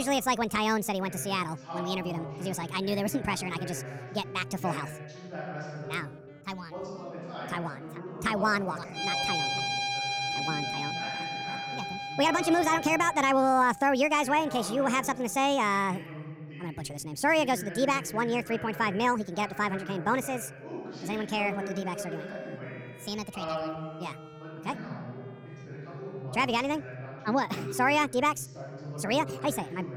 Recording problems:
wrong speed and pitch; too fast and too high; 1.5 times normal speed
background music; loud; throughout; 4 dB below the speech
voice in the background; noticeable; throughout; 10 dB below the speech
abrupt cut into speech; at the start

